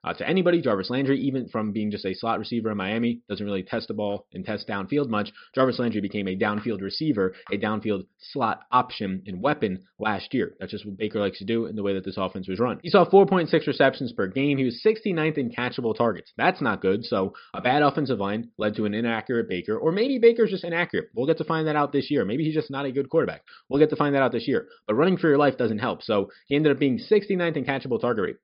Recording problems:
high frequencies cut off; noticeable; nothing above 5.5 kHz

